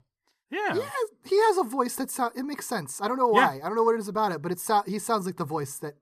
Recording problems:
none

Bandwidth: 14 kHz